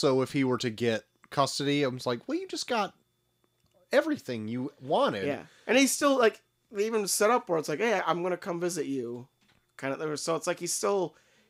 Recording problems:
abrupt cut into speech; at the start

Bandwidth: 15.5 kHz